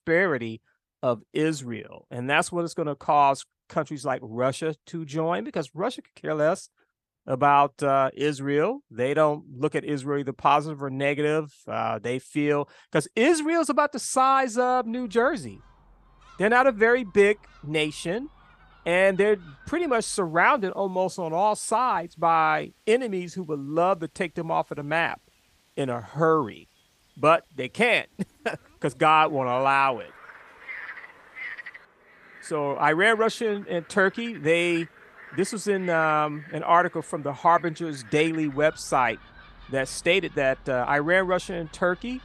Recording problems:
animal sounds; faint; from 15 s on; 20 dB below the speech

